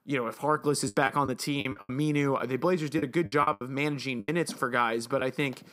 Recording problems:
choppy; very; 10% of the speech affected

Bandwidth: 15.5 kHz